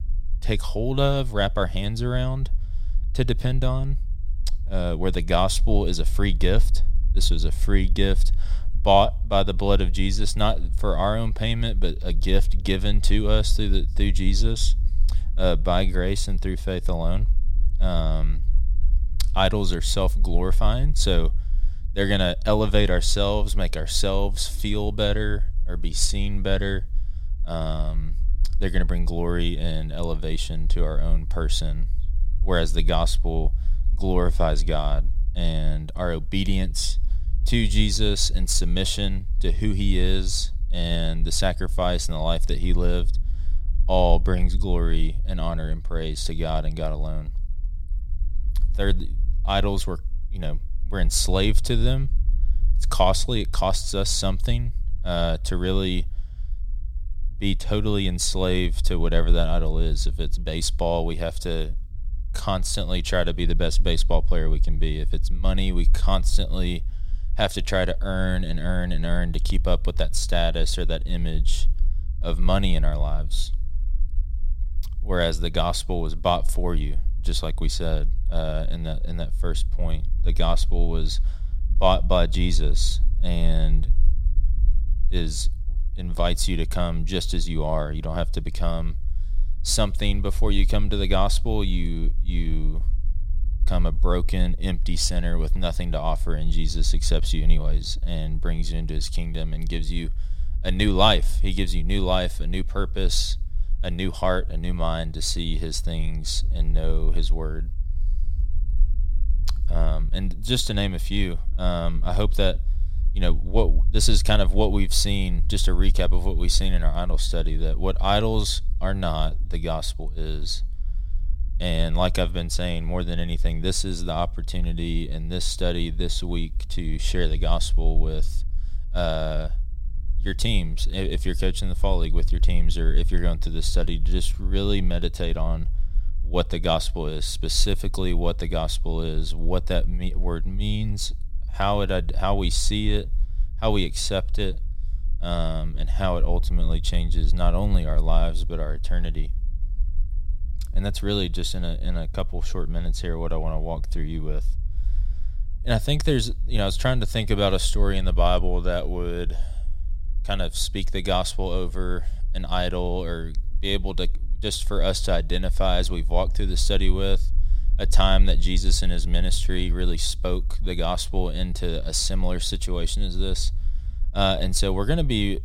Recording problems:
low rumble; faint; throughout; 25 dB below the speech

